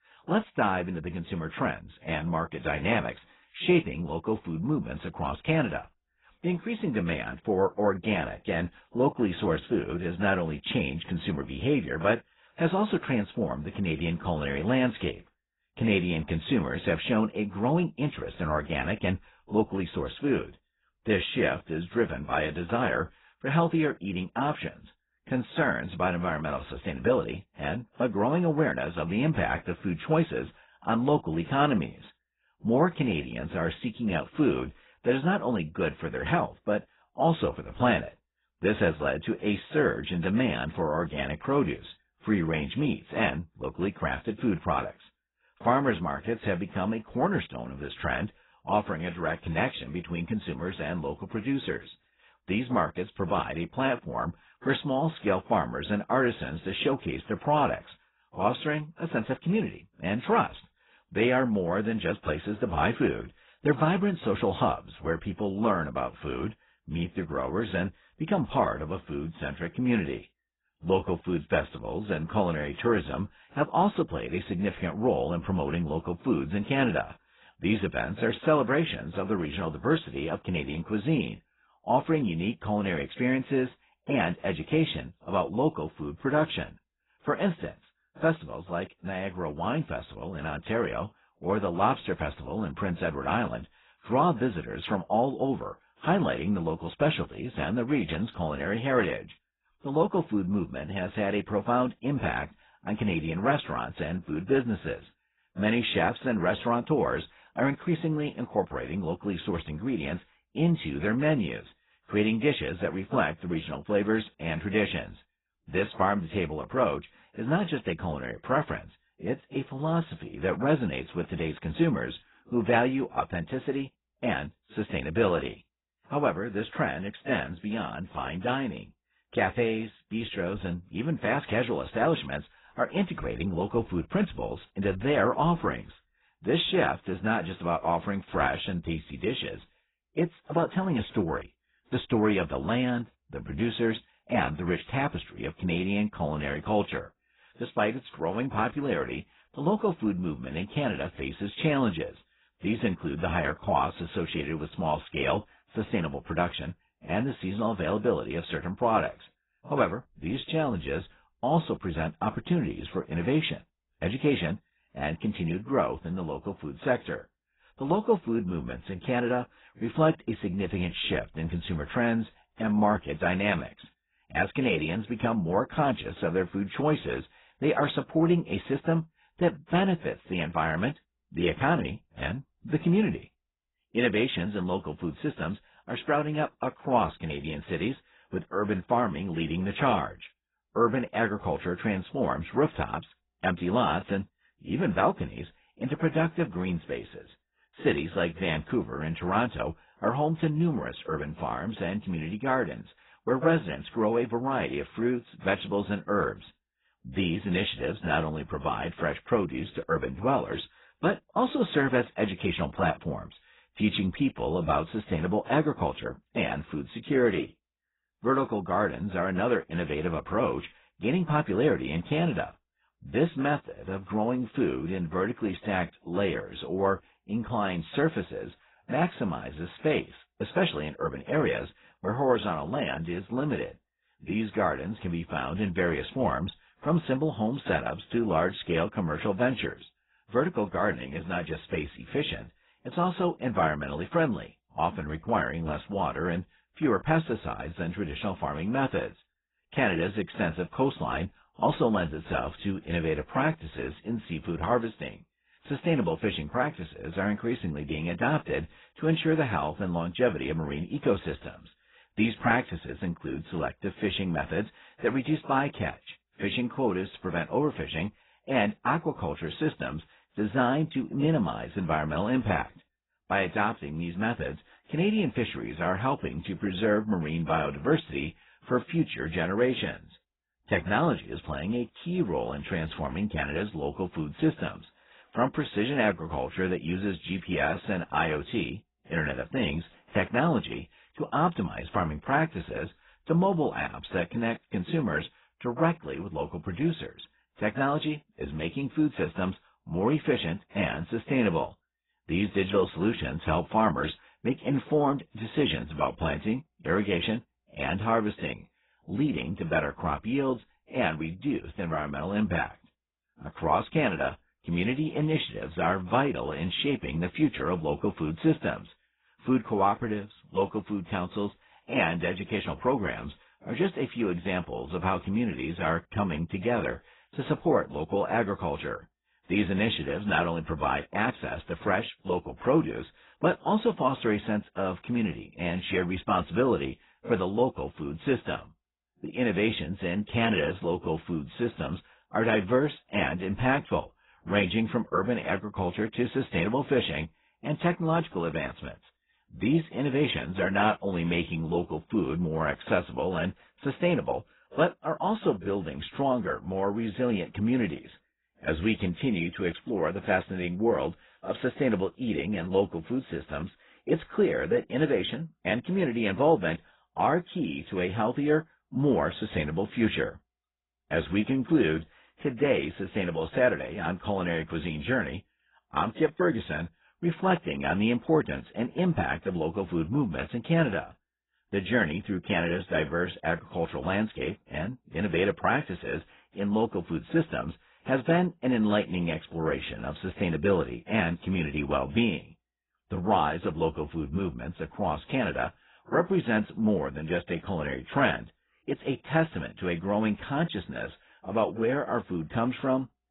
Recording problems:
garbled, watery; badly; nothing above 4 kHz

